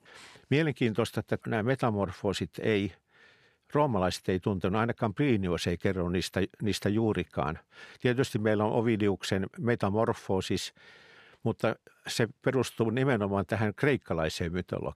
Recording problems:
none

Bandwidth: 14.5 kHz